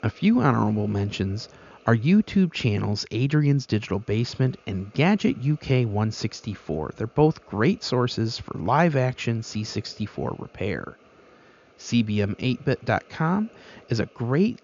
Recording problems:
high frequencies cut off; noticeable; nothing above 7 kHz
hiss; faint; throughout; 30 dB below the speech

